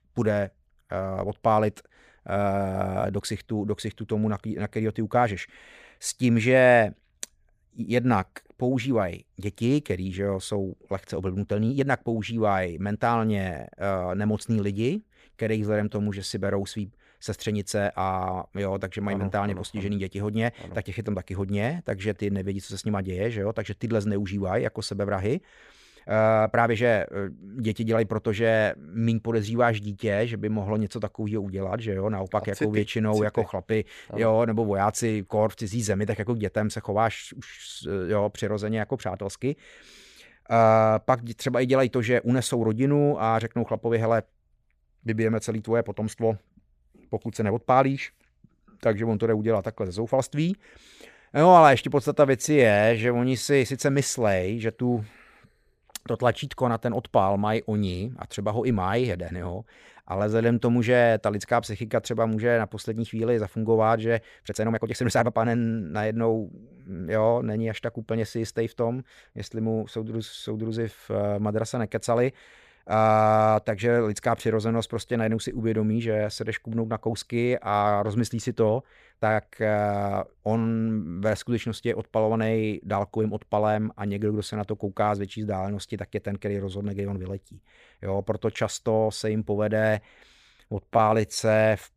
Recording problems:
uneven, jittery; strongly; from 3 s to 1:31

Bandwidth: 15 kHz